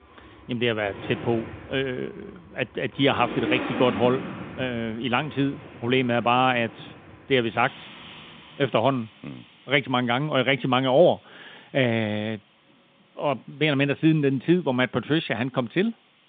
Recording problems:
phone-call audio; nothing above 3.5 kHz
traffic noise; noticeable; throughout; 15 dB below the speech

